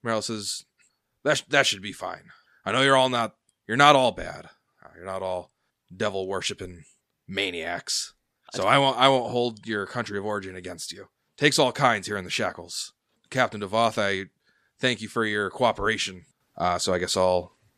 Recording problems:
none

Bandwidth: 14.5 kHz